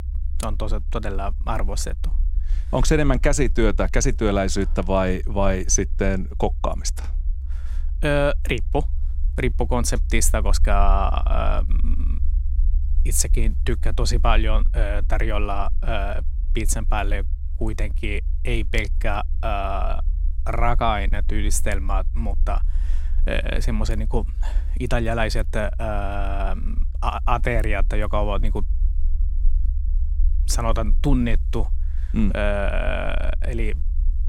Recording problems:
low rumble; faint; throughout; 25 dB below the speech

